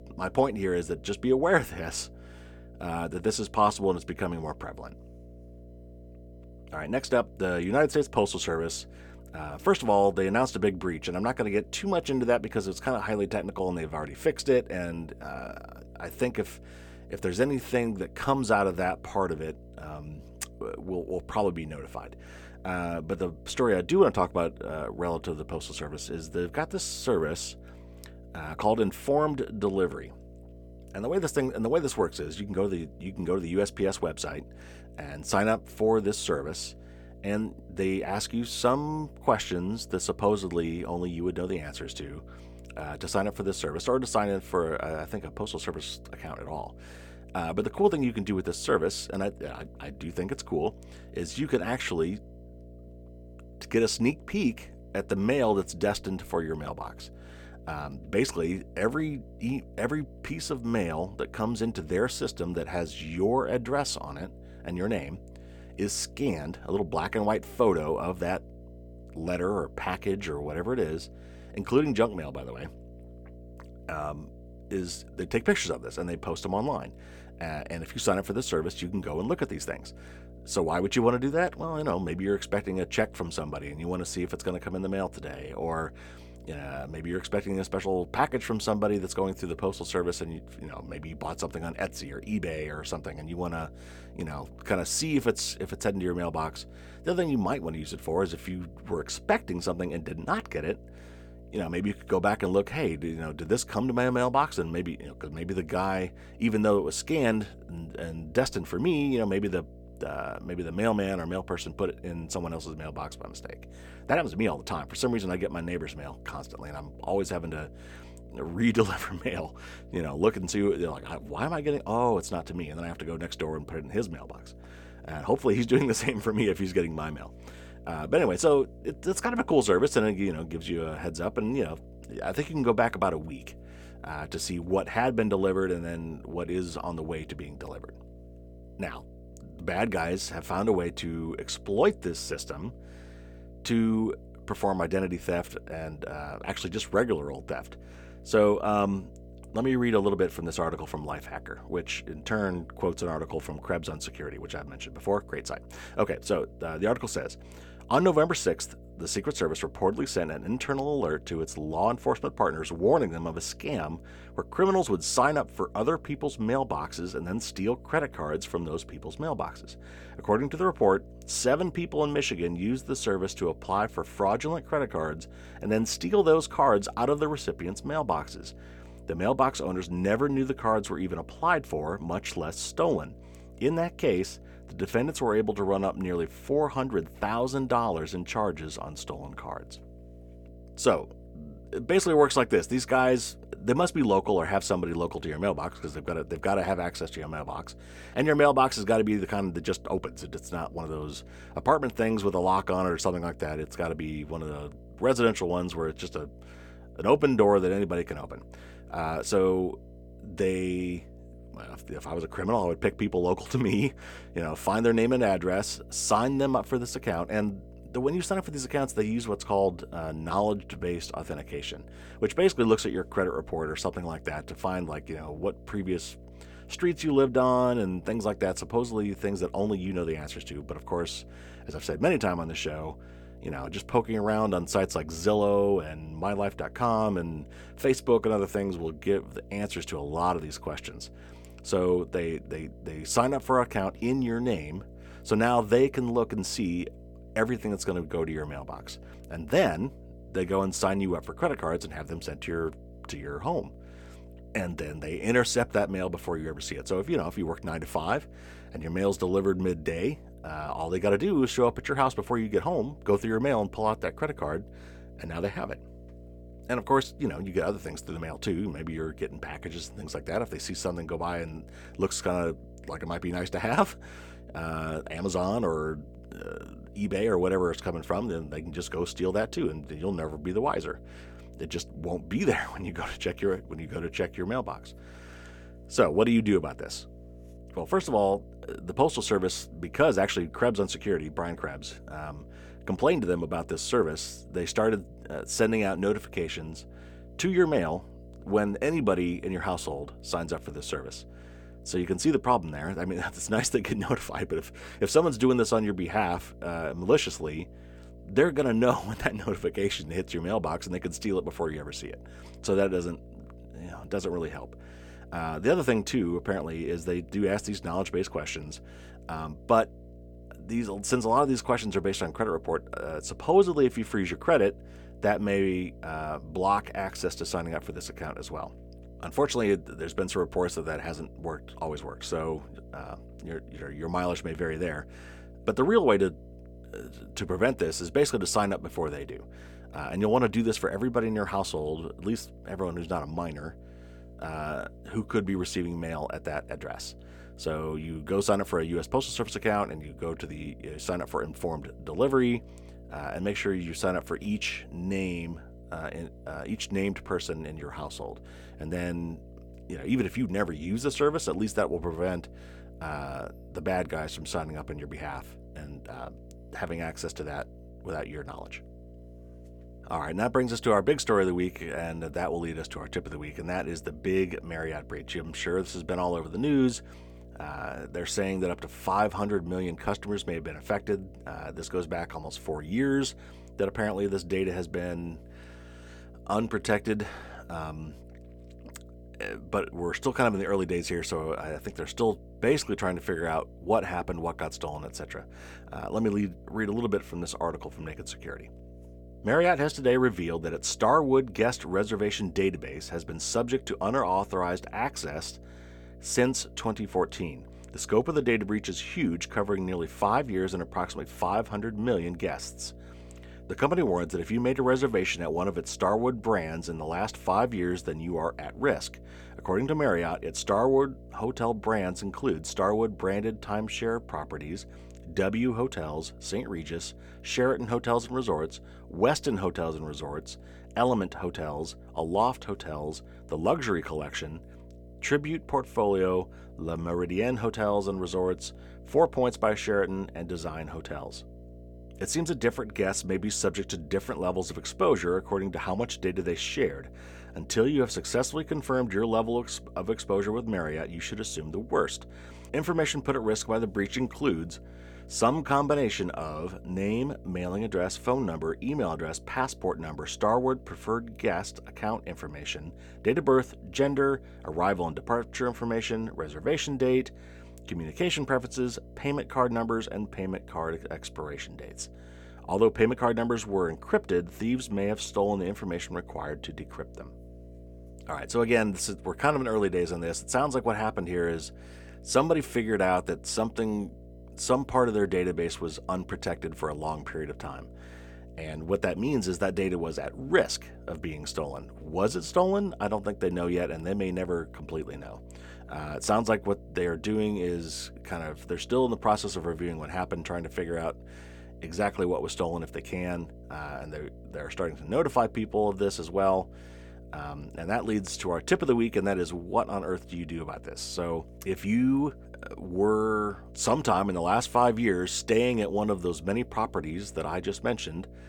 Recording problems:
electrical hum; faint; throughout; 60 Hz, 25 dB below the speech

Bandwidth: 18.5 kHz